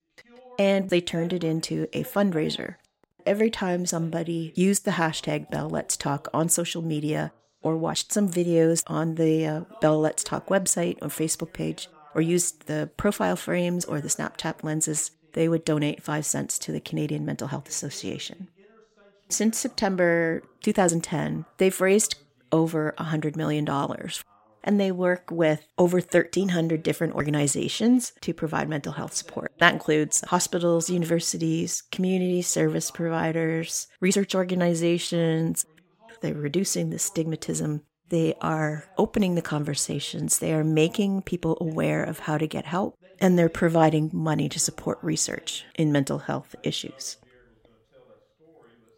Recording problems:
voice in the background; faint; throughout; 30 dB below the speech

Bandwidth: 16 kHz